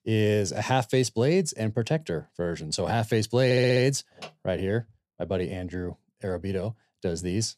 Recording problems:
audio stuttering; at 3.5 s

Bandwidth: 14 kHz